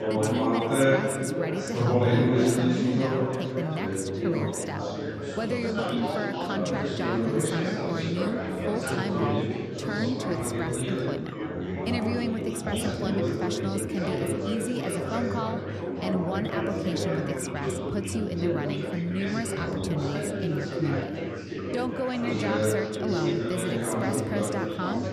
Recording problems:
chatter from many people; very loud; throughout; 4 dB above the speech

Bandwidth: 13.5 kHz